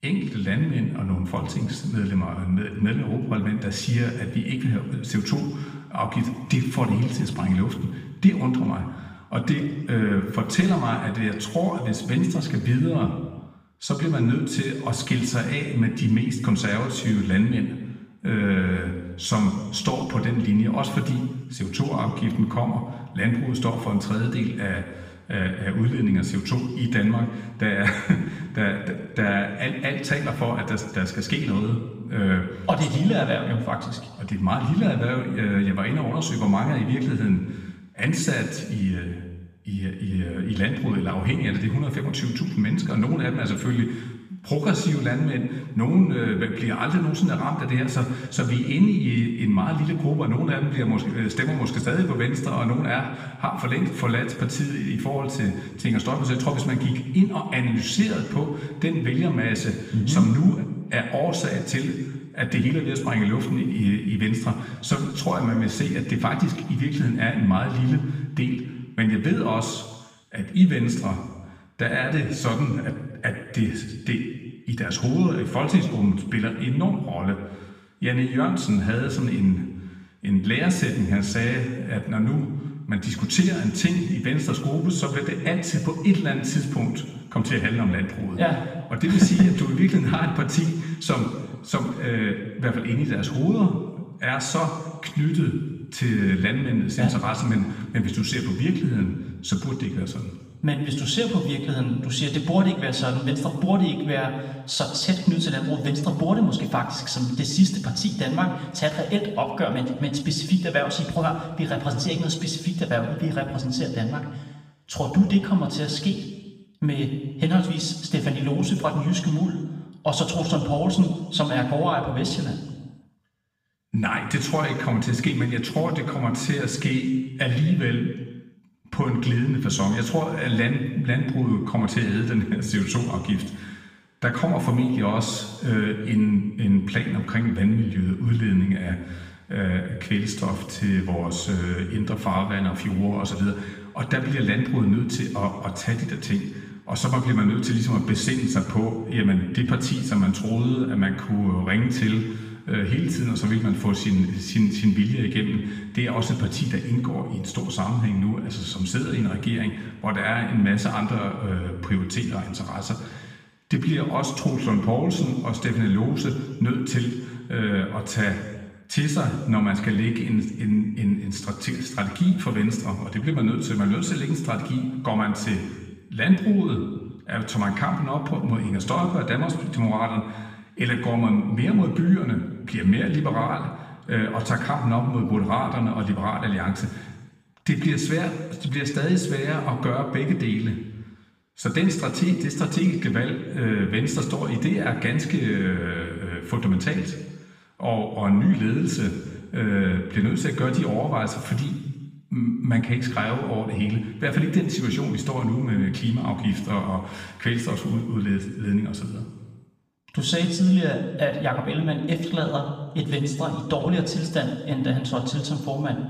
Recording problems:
room echo; noticeable; dies away in 1.2 s
off-mic speech; somewhat distant

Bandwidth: 15 kHz